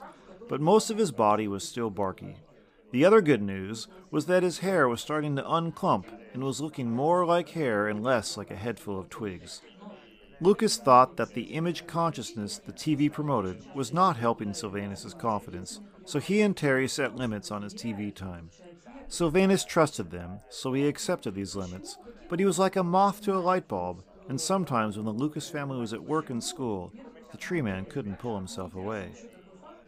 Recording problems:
background chatter; faint; throughout; 4 voices, 20 dB below the speech

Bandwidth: 15 kHz